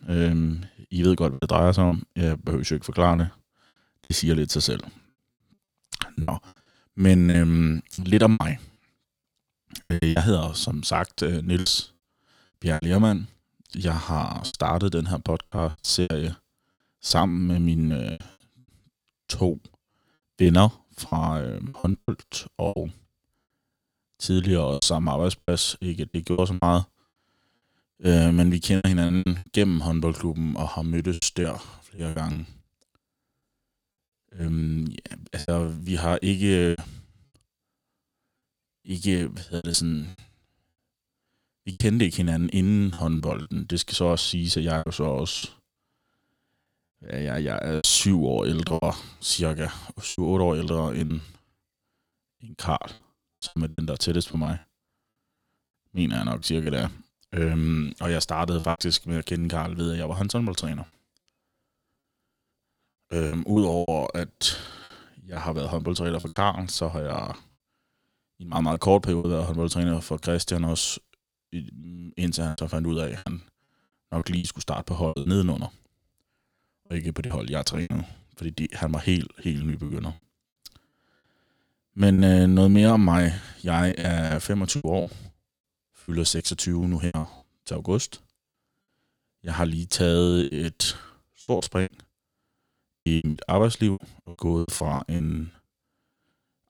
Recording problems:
choppy; very; 10% of the speech affected

